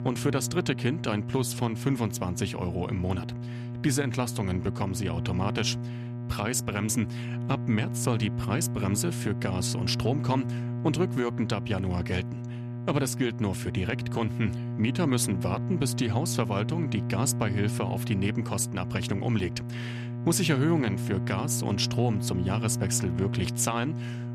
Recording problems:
electrical hum; loud; throughout; 60 Hz, 10 dB below the speech

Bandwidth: 14 kHz